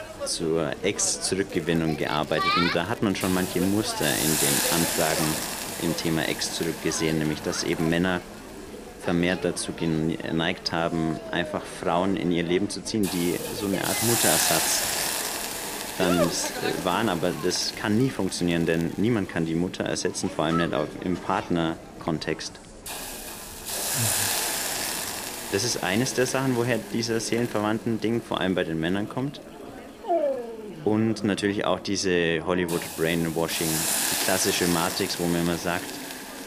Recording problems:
animal sounds; loud; throughout; 10 dB below the speech
hiss; loud; throughout; 2 dB below the speech
background chatter; noticeable; throughout; 3 voices, 15 dB below the speech
crackling; very faint; from 1.5 to 4 s, from 16 to 19 s and at 23 s; 25 dB below the speech

